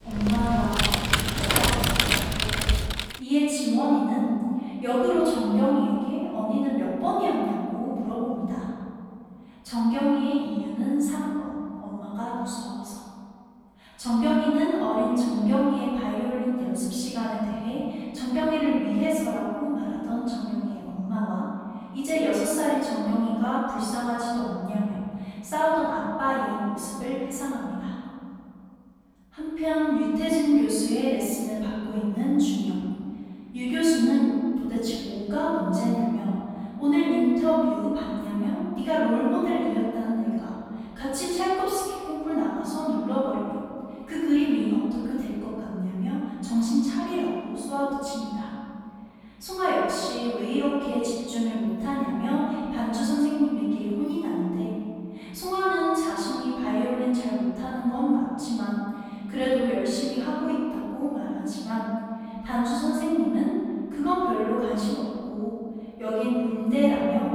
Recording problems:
room echo; strong; dies away in 2.8 s
off-mic speech; far
keyboard typing; loud; until 3 s; peak 6 dB above the speech

